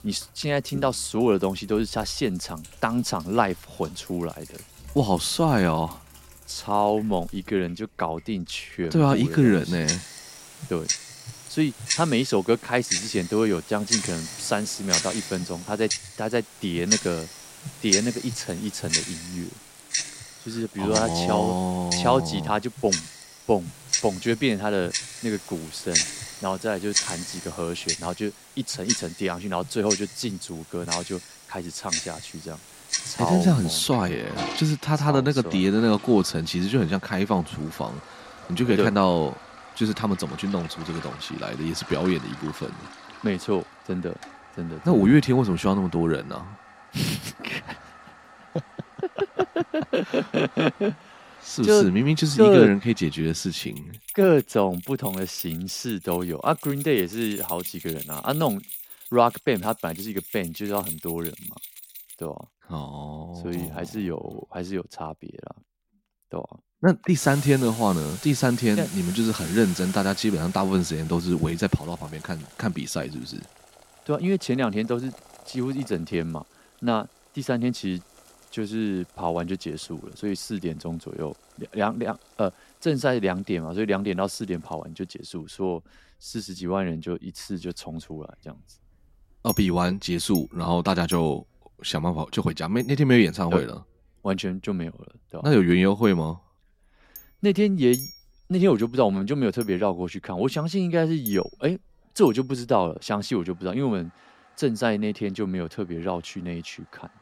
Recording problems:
household noises; loud; throughout; 7 dB below the speech

